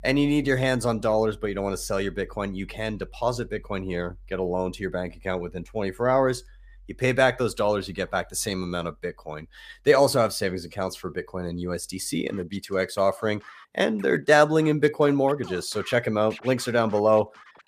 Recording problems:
background music; faint; throughout; 25 dB below the speech

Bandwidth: 15 kHz